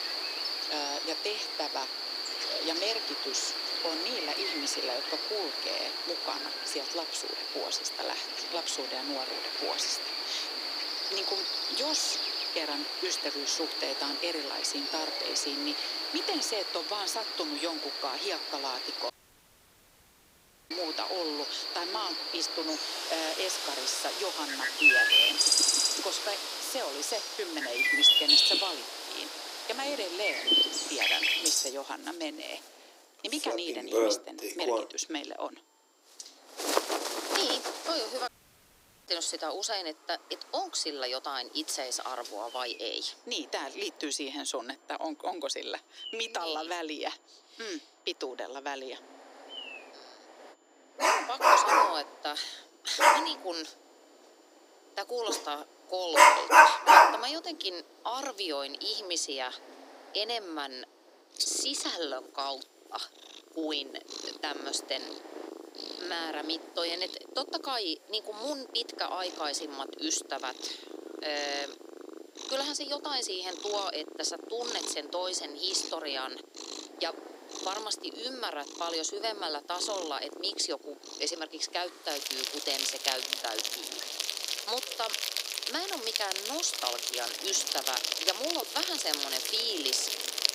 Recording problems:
thin; somewhat; fading below 300 Hz
animal sounds; very loud; throughout; 6 dB above the speech
wind noise on the microphone; occasional gusts; 20 dB below the speech
high-pitched whine; faint; until 25 s, from 29 to 56 s and from 1:01 on; 7 kHz, 35 dB below the speech
audio cutting out; at 19 s for 1.5 s and at 38 s for 1 s

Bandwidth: 15.5 kHz